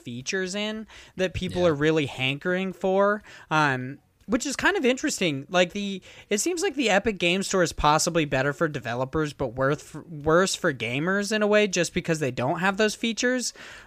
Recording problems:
none

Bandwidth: 15 kHz